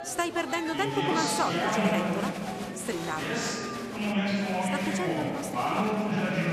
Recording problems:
murmuring crowd; very loud; throughout; 3 dB above the speech

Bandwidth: 14 kHz